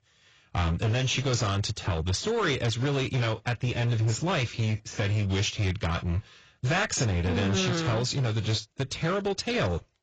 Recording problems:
garbled, watery; badly; nothing above 7.5 kHz
distortion; slight; 16% of the sound clipped

